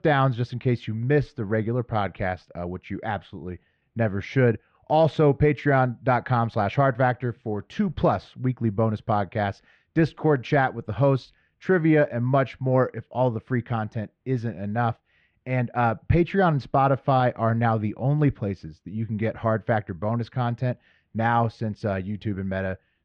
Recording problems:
muffled; very; fading above 2.5 kHz

